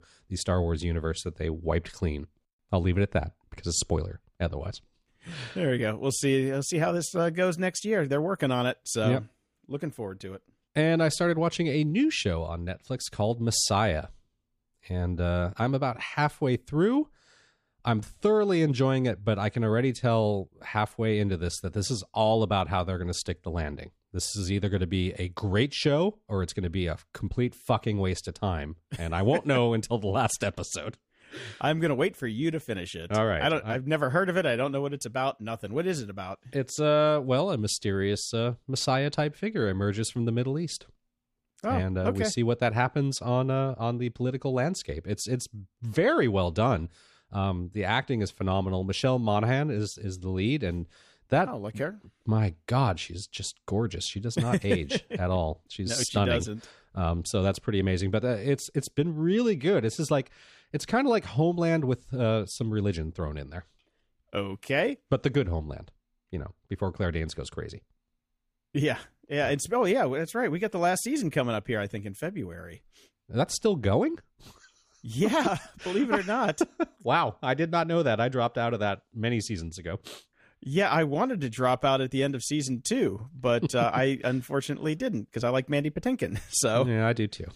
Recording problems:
none

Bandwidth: 15 kHz